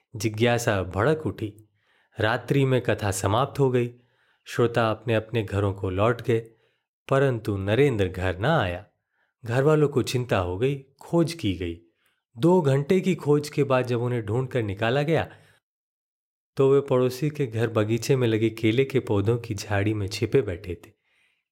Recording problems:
none

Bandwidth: 16 kHz